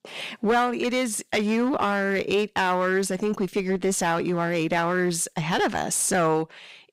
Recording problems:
distortion; slight; 7% of the sound clipped

